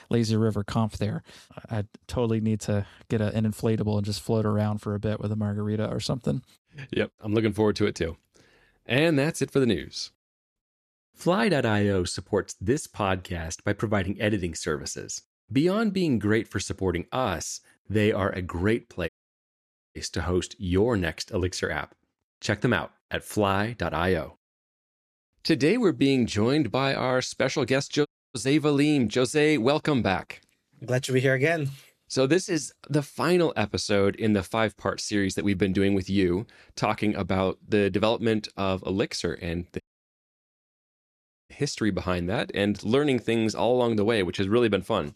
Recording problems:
audio cutting out; at 19 s for 1 s, at 28 s and at 40 s for 1.5 s

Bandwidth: 13.5 kHz